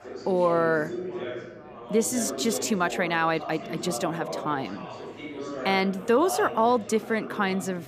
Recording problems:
background chatter; loud; throughout; 4 voices, 10 dB below the speech

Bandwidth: 15 kHz